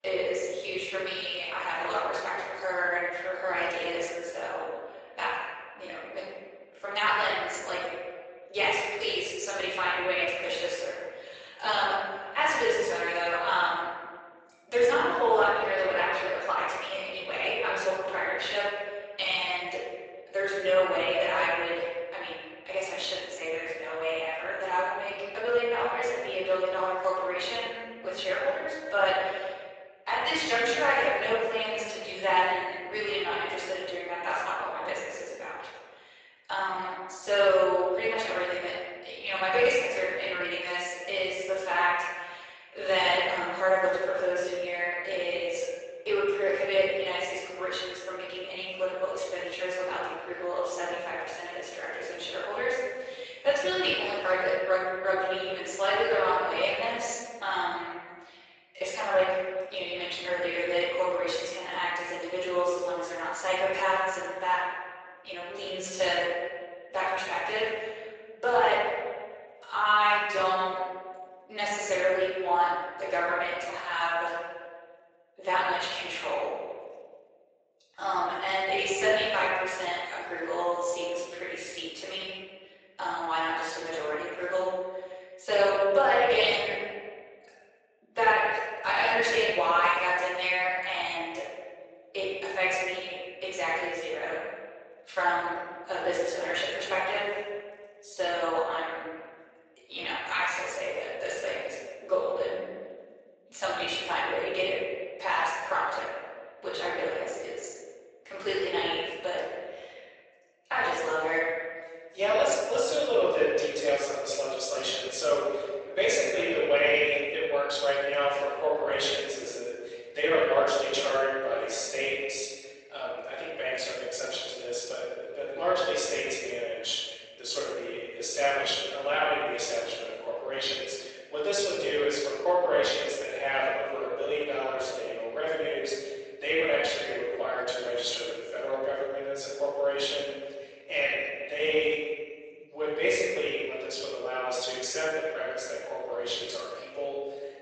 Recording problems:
room echo; strong; dies away in 1.6 s
off-mic speech; far
thin; very; fading below 450 Hz
garbled, watery; slightly; nothing above 8 kHz

